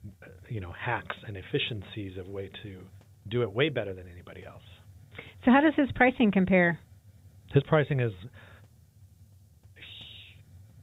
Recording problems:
high frequencies cut off; severe; nothing above 4 kHz
hiss; faint; throughout; 30 dB below the speech

